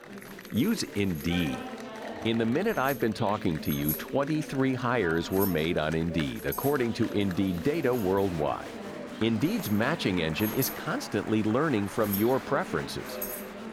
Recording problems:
household noises; noticeable; throughout; 10 dB below the speech
chatter from many people; noticeable; throughout; 10 dB below the speech

